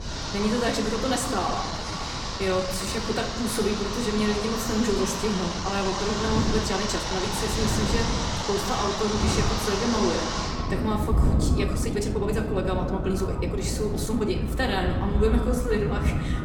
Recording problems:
echo of what is said; noticeable; from 8 s on; 210 ms later, 15 dB below the speech
room echo; slight; dies away in 0.9 s
off-mic speech; somewhat distant
rain or running water; loud; throughout; 2 dB below the speech
wind noise on the microphone; occasional gusts; 10 dB below the speech
uneven, jittery; strongly; from 1.5 to 16 s

